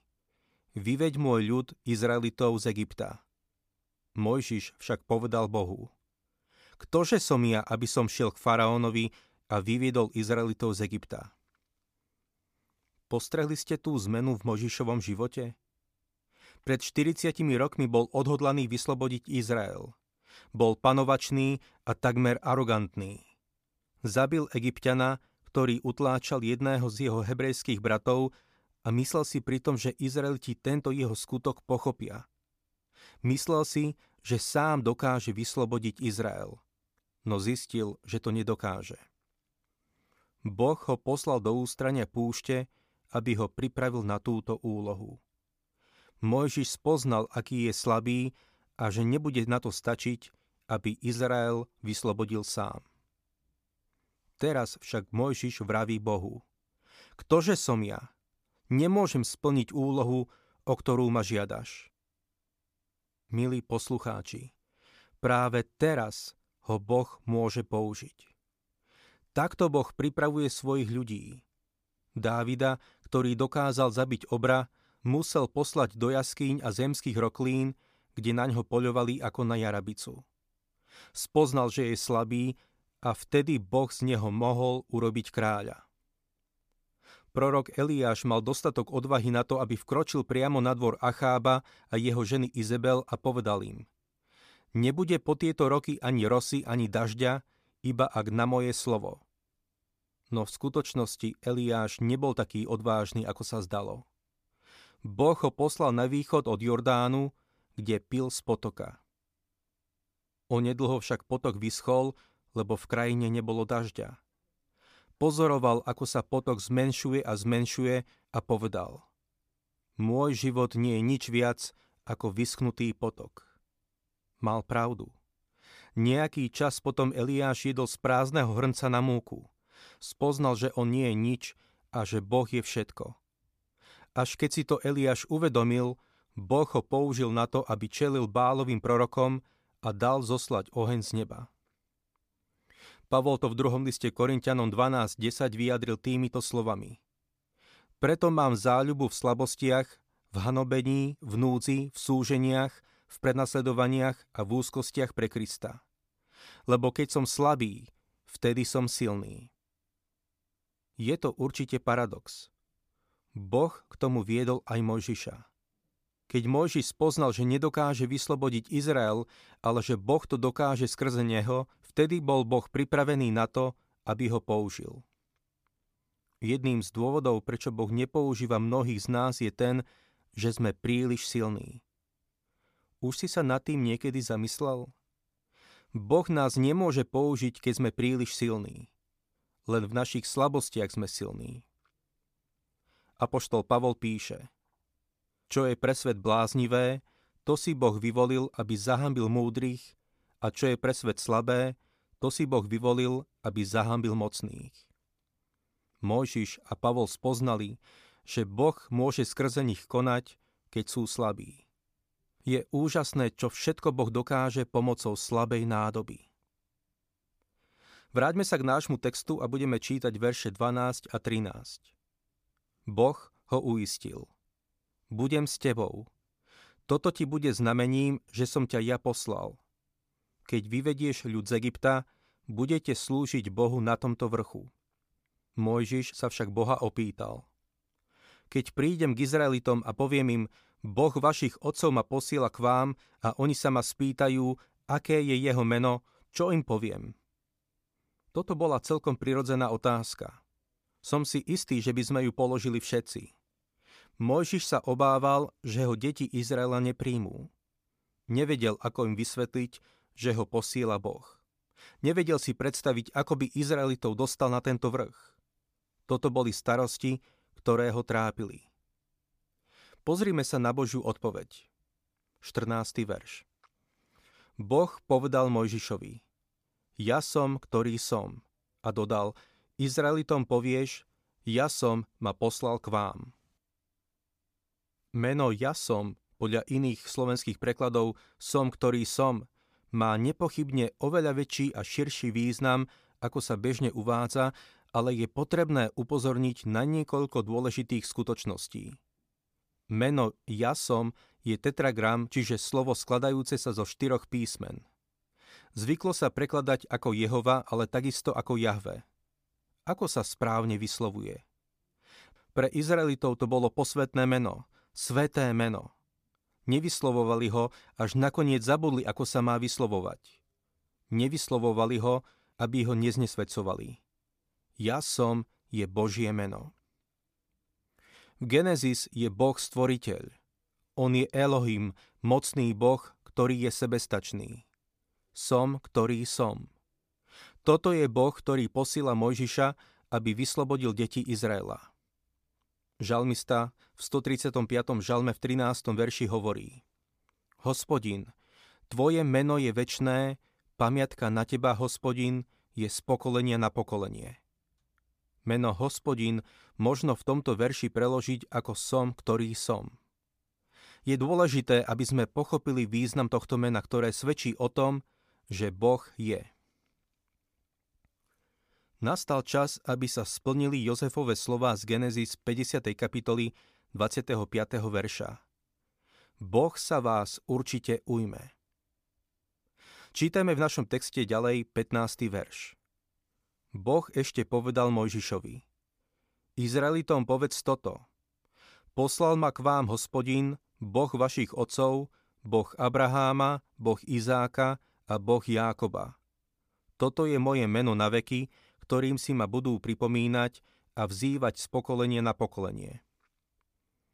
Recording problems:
none

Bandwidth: 15 kHz